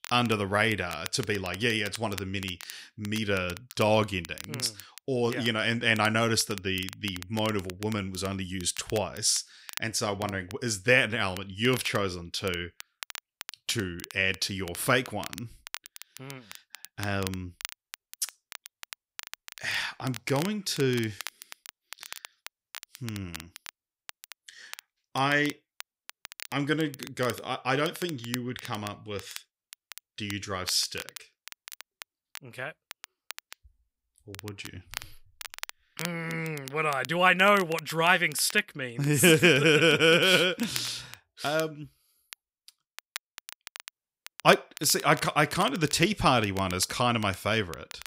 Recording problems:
crackle, like an old record; noticeable; 15 dB below the speech

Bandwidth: 15.5 kHz